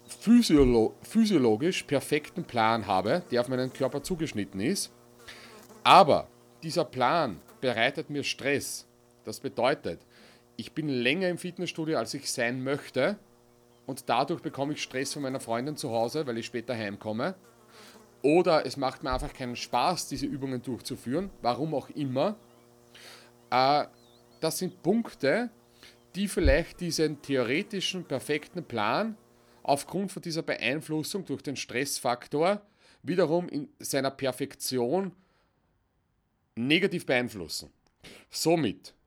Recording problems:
electrical hum; faint; until 30 s; 60 Hz, 30 dB below the speech

